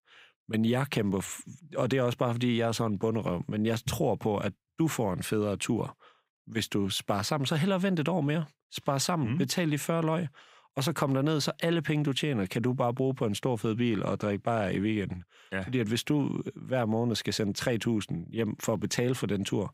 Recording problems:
none

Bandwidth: 15.5 kHz